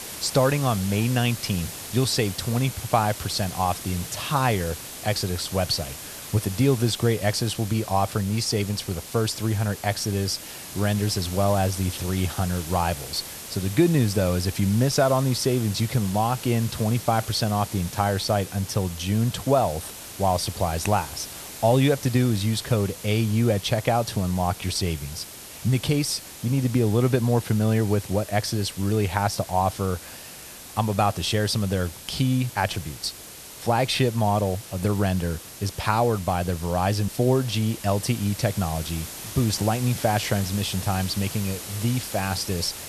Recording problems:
hiss; noticeable; throughout; 10 dB below the speech

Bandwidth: 13.5 kHz